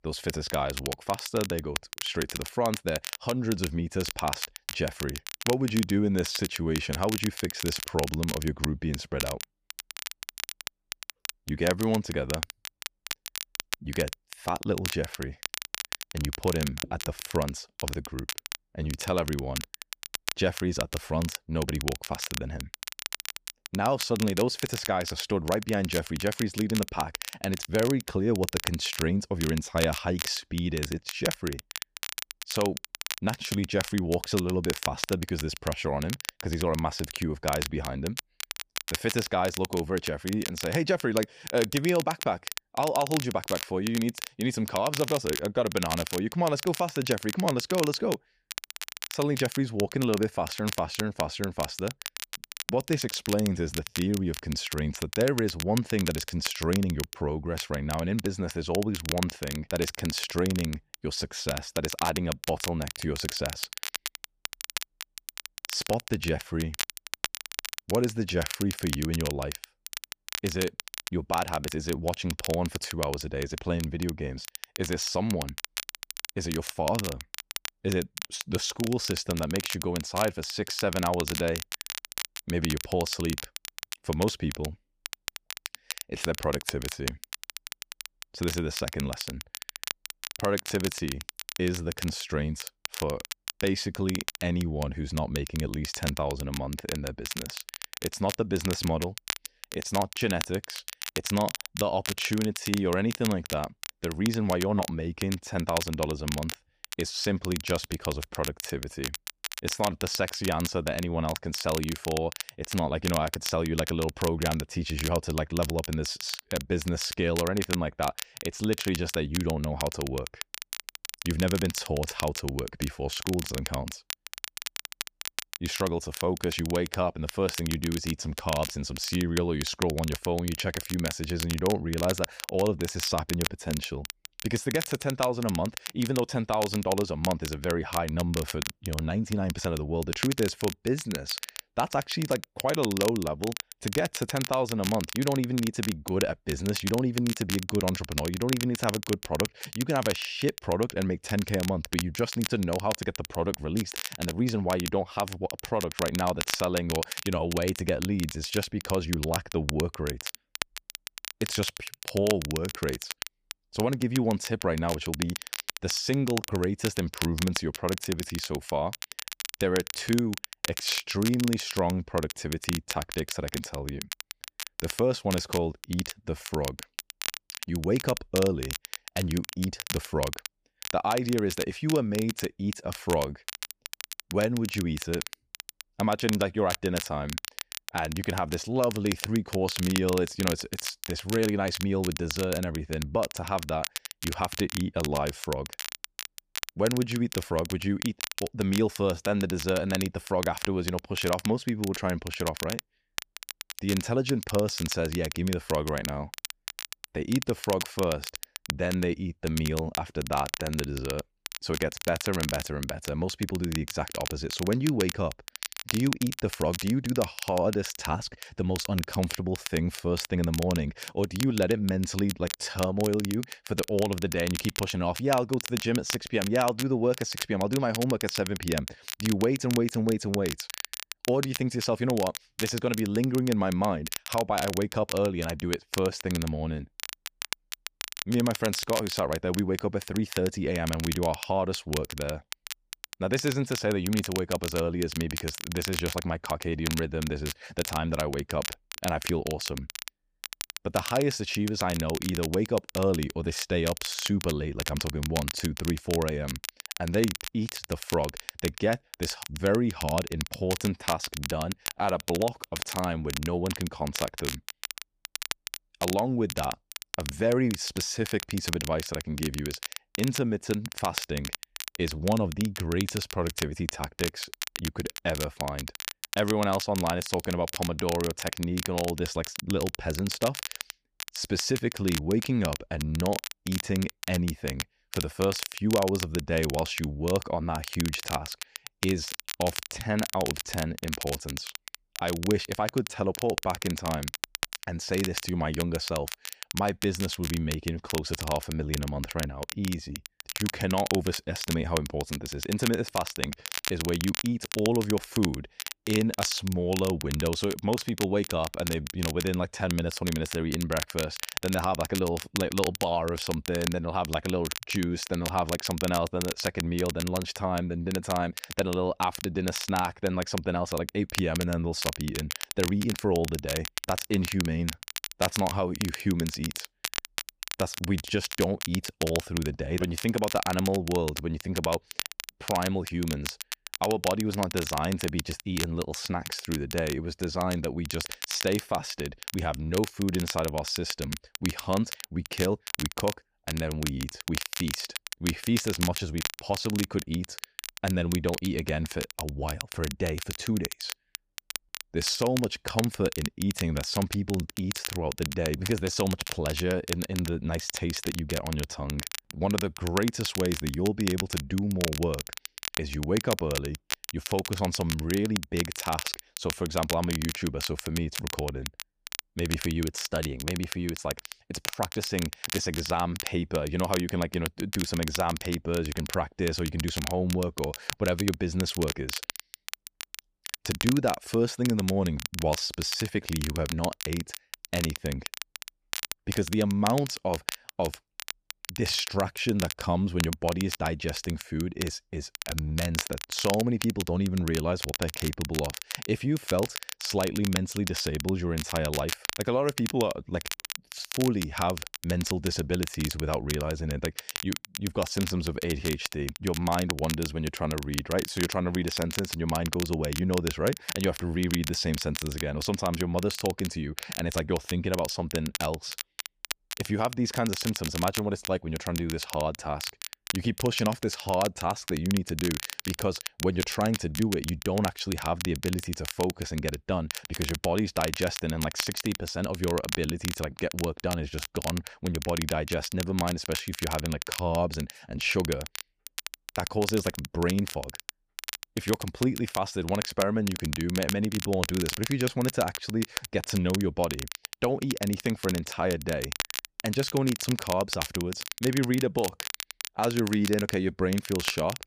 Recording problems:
crackle, like an old record; loud; 6 dB below the speech

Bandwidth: 15 kHz